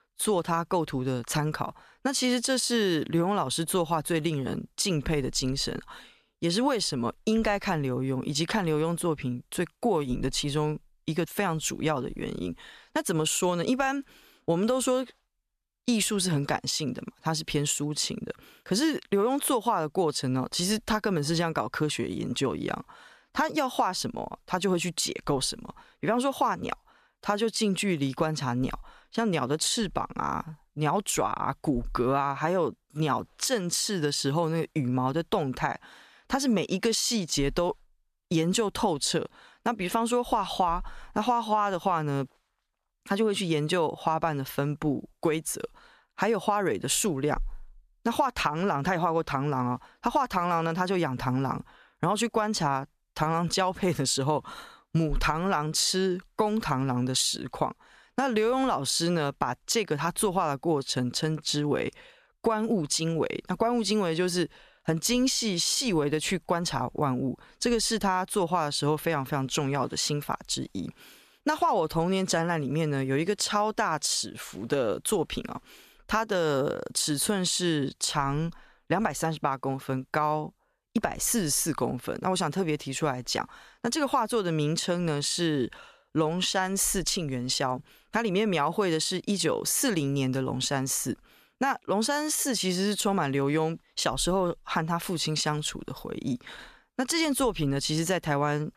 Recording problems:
none

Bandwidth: 14.5 kHz